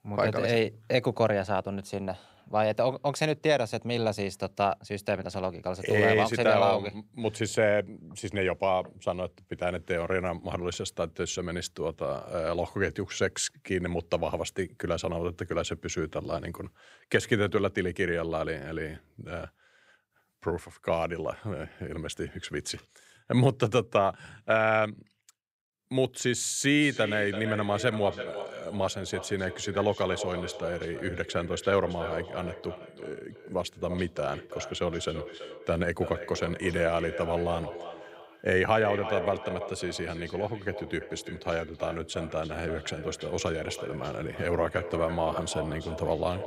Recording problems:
echo of what is said; strong; from 27 s on; 330 ms later, 10 dB below the speech

